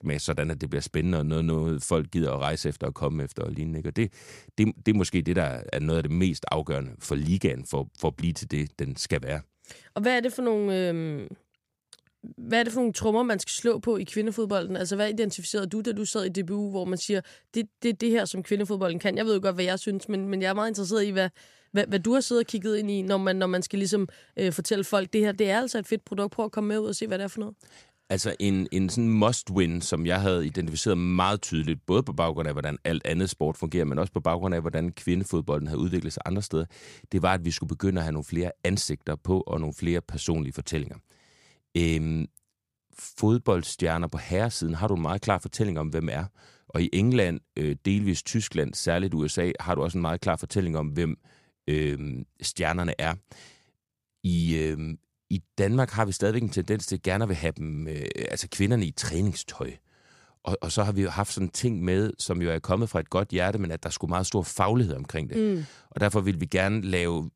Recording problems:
none

